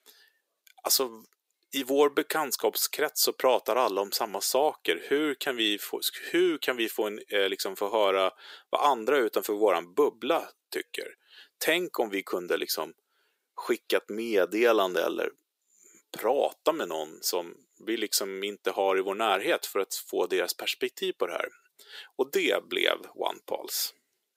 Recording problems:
thin; somewhat; fading below 350 Hz

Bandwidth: 15.5 kHz